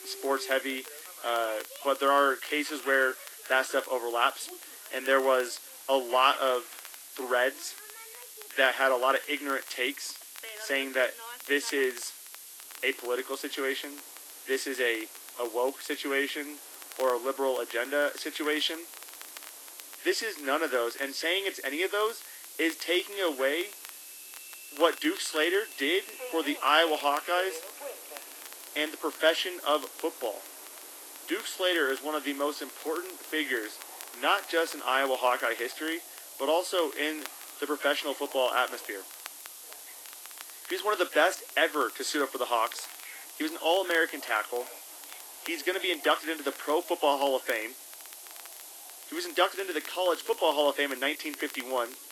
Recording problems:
garbled, watery; slightly; nothing above 13.5 kHz
thin; very slightly; fading below 250 Hz
hiss; noticeable; throughout; 15 dB below the speech
train or aircraft noise; faint; throughout; 20 dB below the speech
crackle, like an old record; faint; 20 dB below the speech

